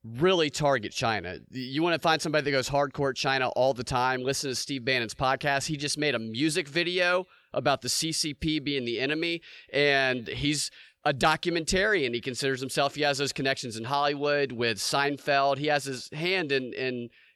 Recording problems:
none

